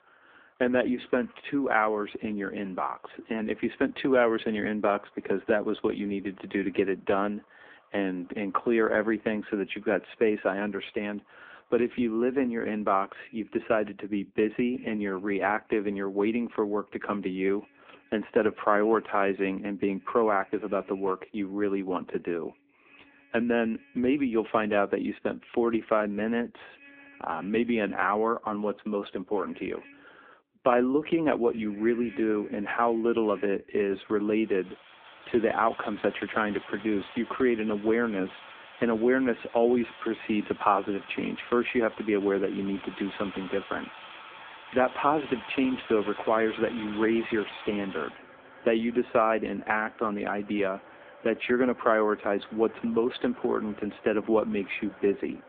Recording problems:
phone-call audio; poor line; nothing above 3.5 kHz
traffic noise; noticeable; throughout; 20 dB below the speech

